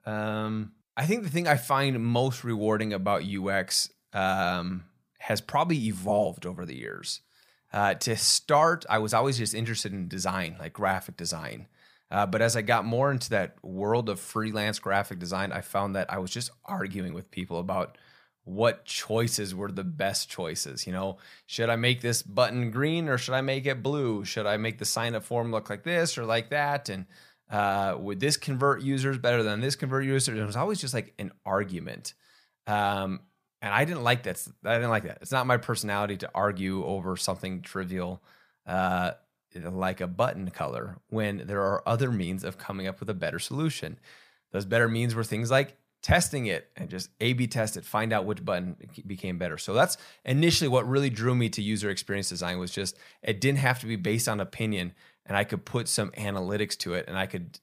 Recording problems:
none

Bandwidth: 15 kHz